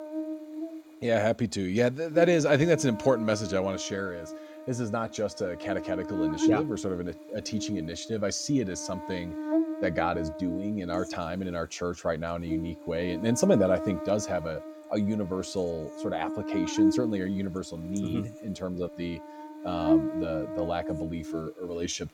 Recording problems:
electrical hum; loud; throughout; 60 Hz, 5 dB below the speech

